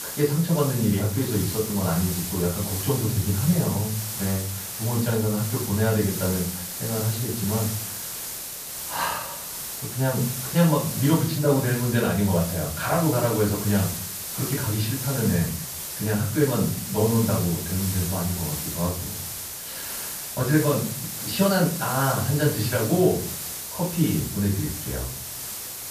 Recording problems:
off-mic speech; far
high frequencies cut off; noticeable; nothing above 5.5 kHz
room echo; slight; dies away in 0.5 s
hiss; loud; throughout; 5 dB below the speech

